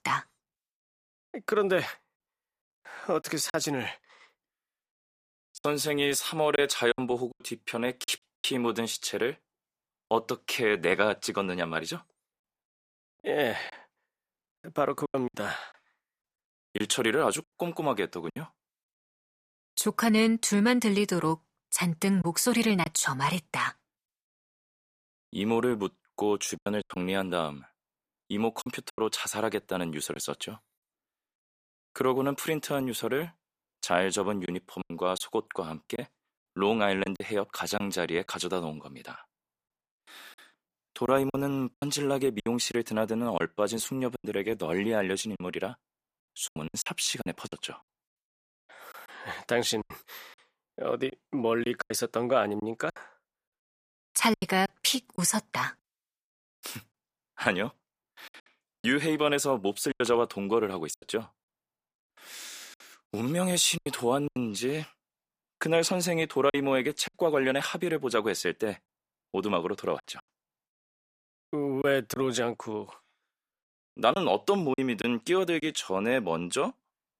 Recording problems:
choppy; very; 7% of the speech affected

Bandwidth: 15 kHz